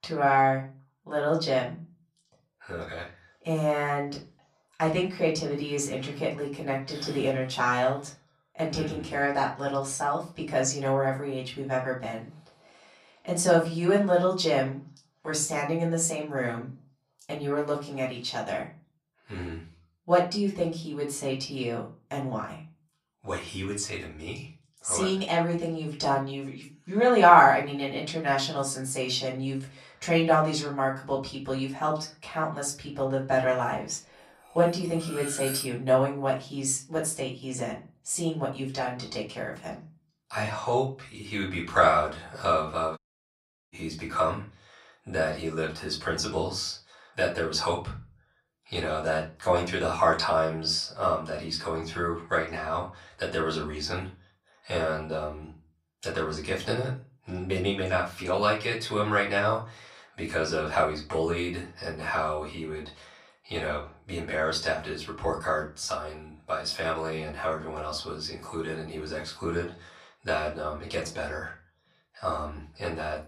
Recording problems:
off-mic speech; far
room echo; slight; dies away in 0.3 s
clattering dishes; noticeable; at 35 s; peak 4 dB below the speech
audio cutting out; at 43 s for 0.5 s

